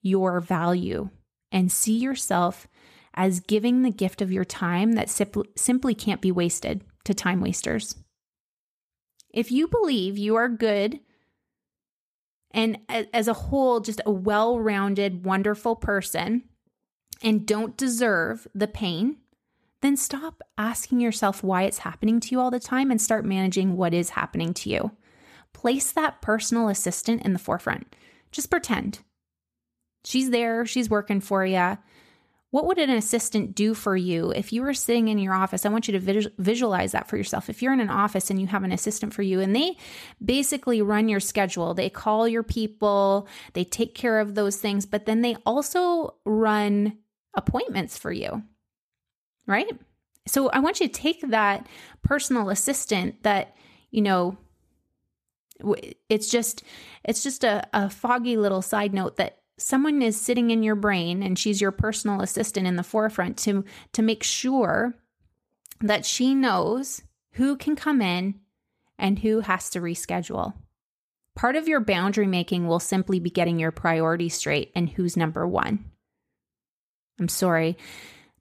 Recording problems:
none

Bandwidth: 14.5 kHz